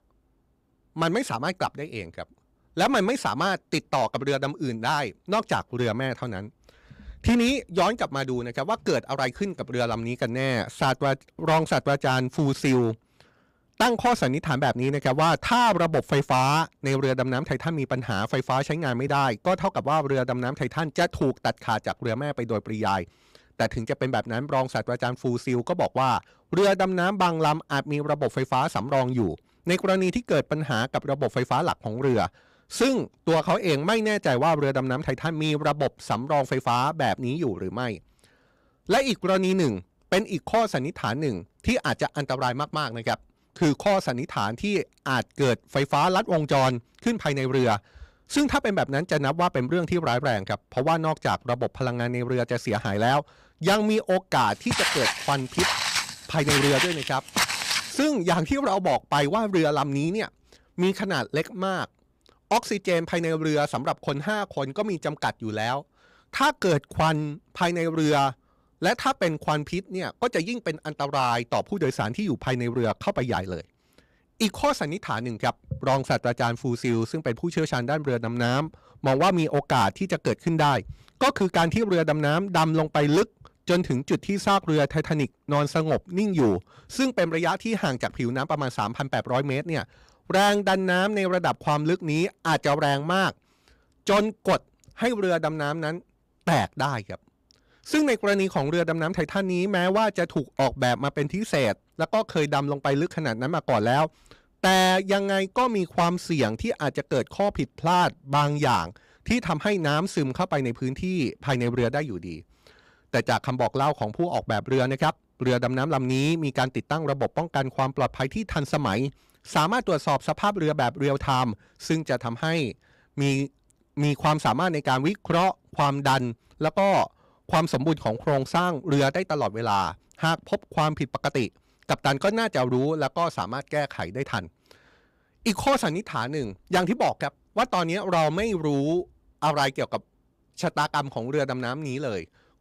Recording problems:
distortion; slight; 5% of the sound clipped
footsteps; loud; from 55 to 58 s; peak 4 dB above the speech

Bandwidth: 15.5 kHz